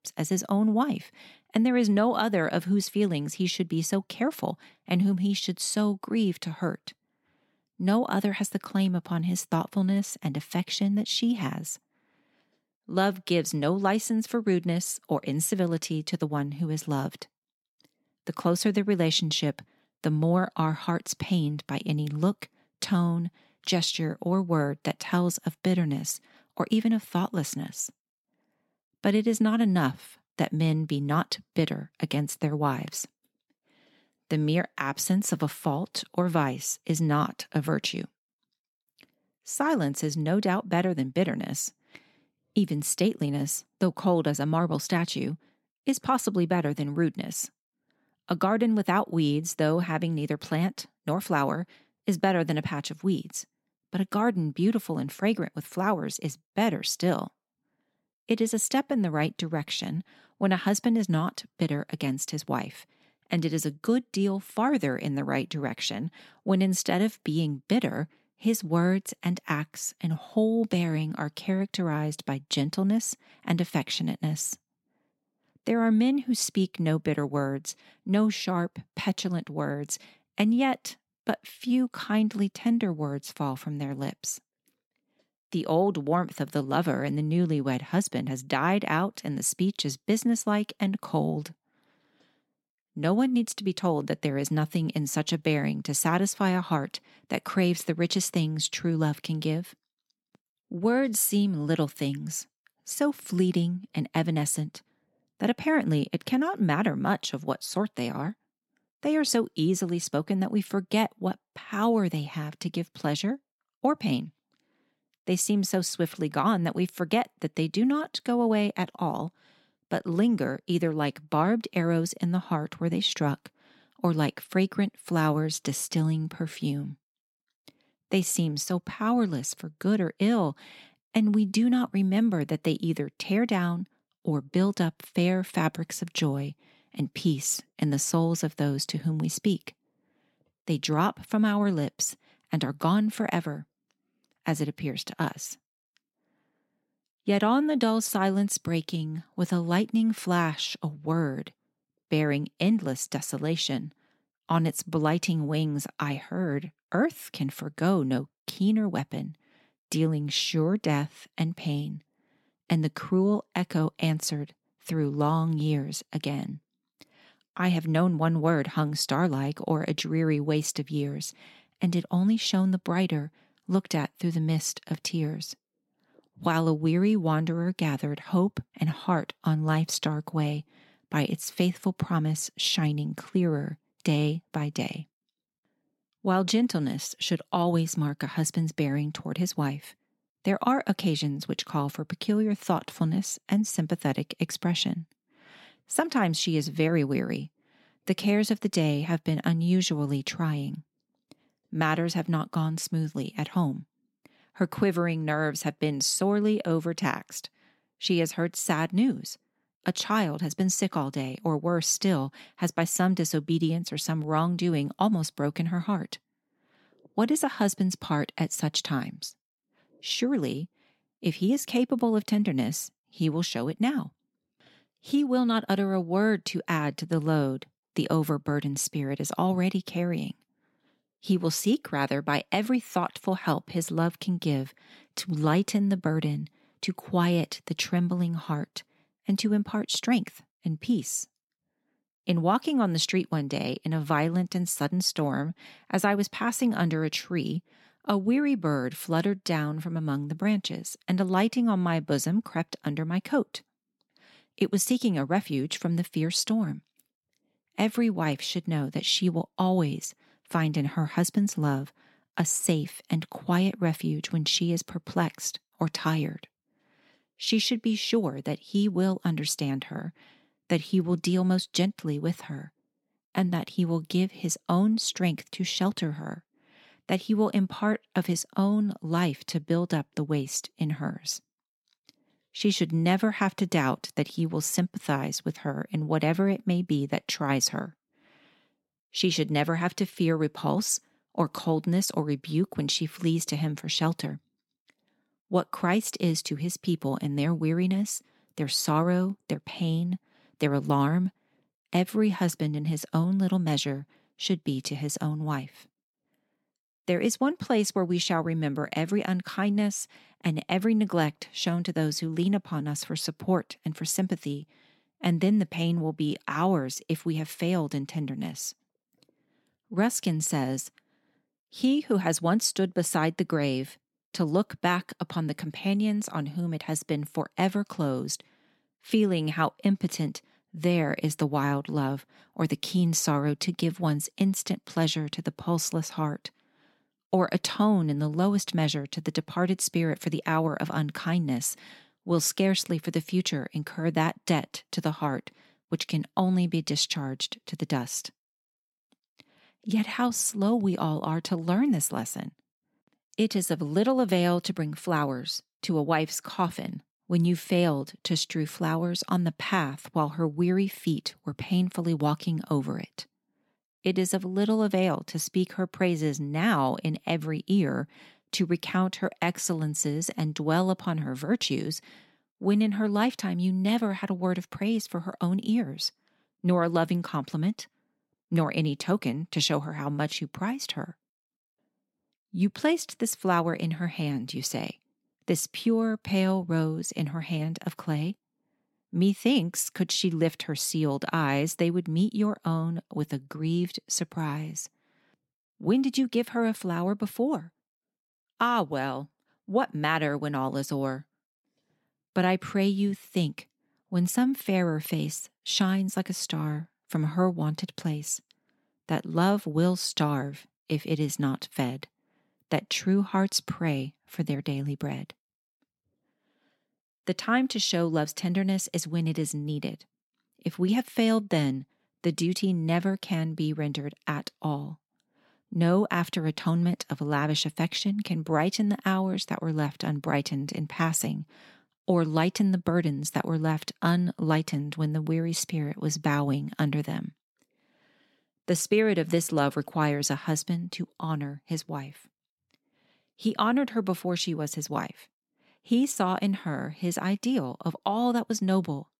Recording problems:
none

